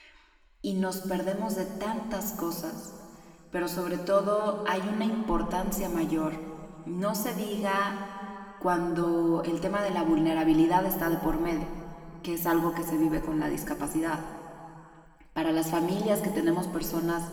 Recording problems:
room echo; noticeable; dies away in 2.2 s
off-mic speech; somewhat distant

